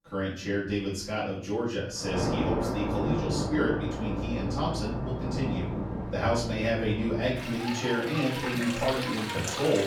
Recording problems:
off-mic speech; far
room echo; noticeable; dies away in 0.5 s
rain or running water; loud; from 2 s on; 3 dB below the speech

